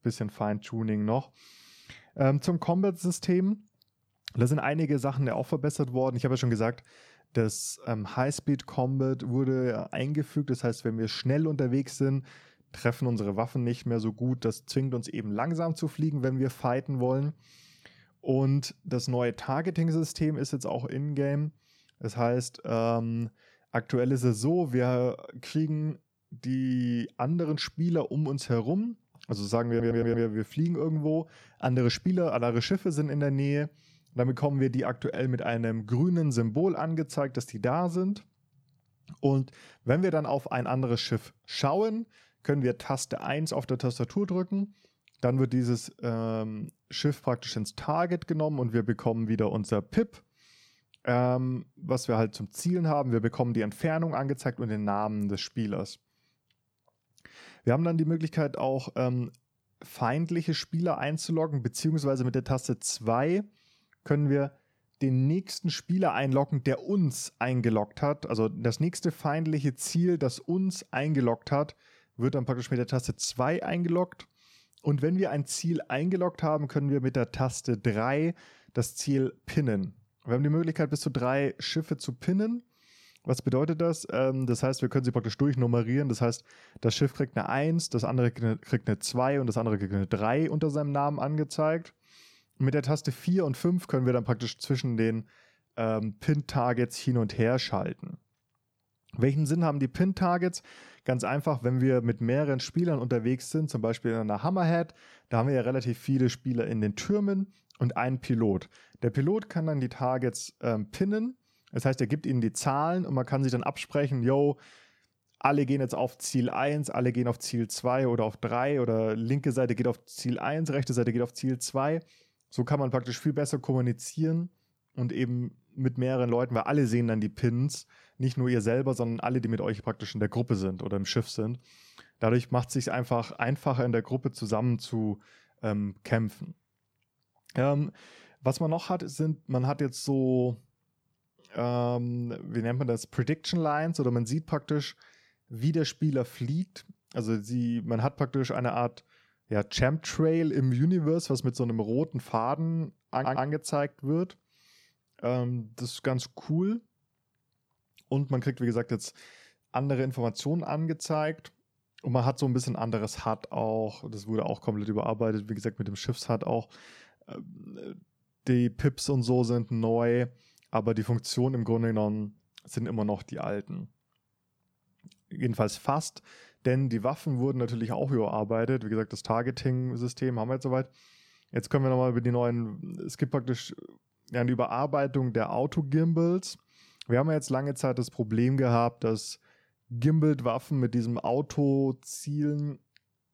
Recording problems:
audio stuttering; at 30 s and at 2:33

